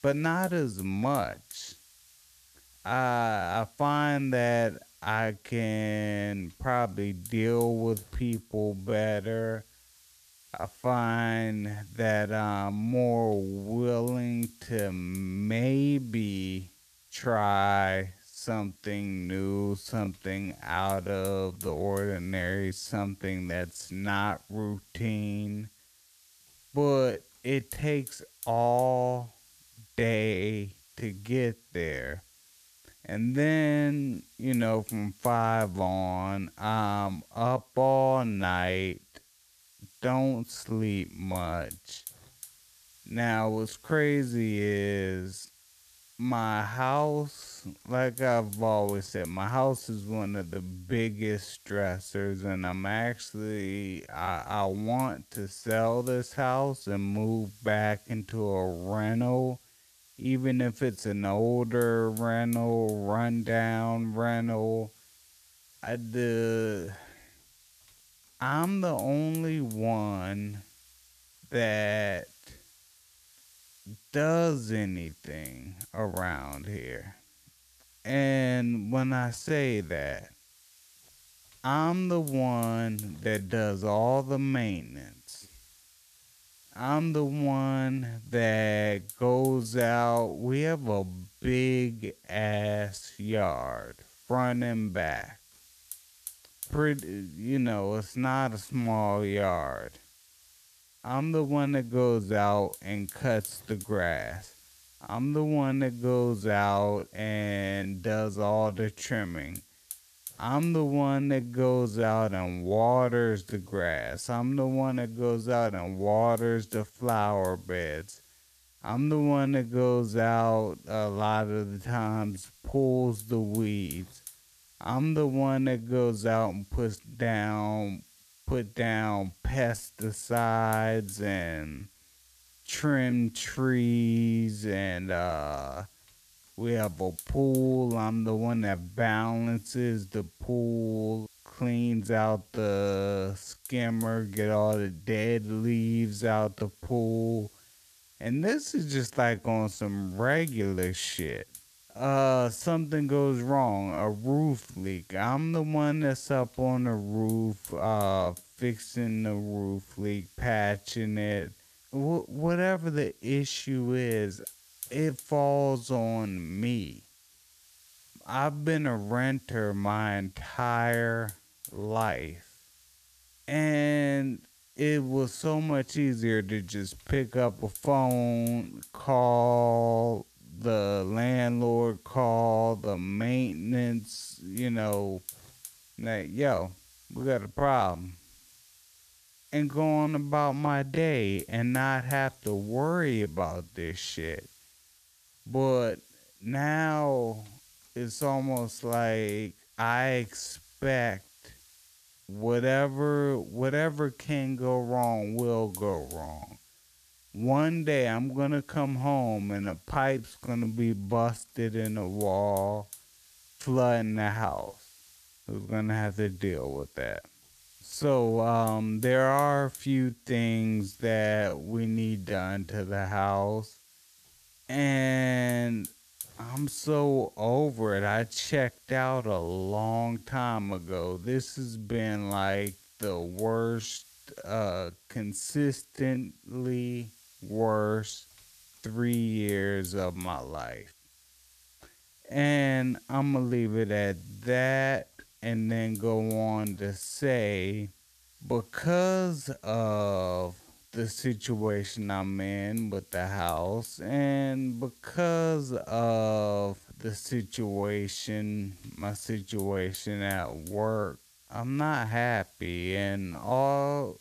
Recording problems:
wrong speed, natural pitch; too slow; 0.6 times normal speed
hiss; faint; throughout; 20 dB below the speech

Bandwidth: 14.5 kHz